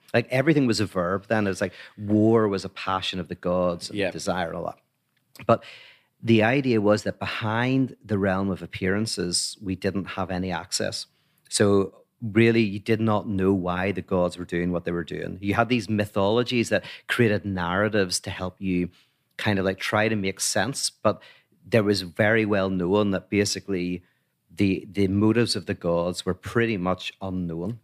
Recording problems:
none

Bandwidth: 15 kHz